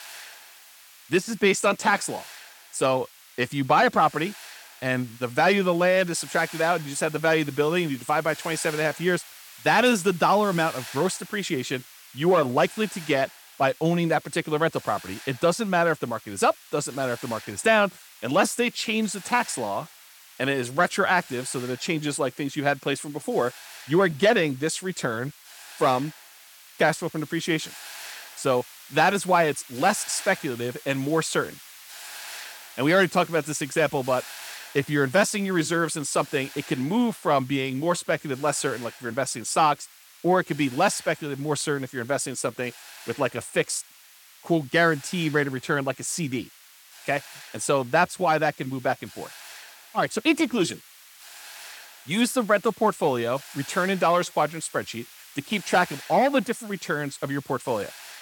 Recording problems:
hiss; noticeable; throughout; 20 dB below the speech

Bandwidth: 17 kHz